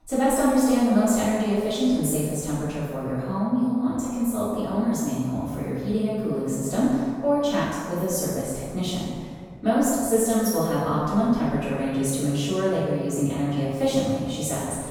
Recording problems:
room echo; strong; dies away in 1.6 s
off-mic speech; far

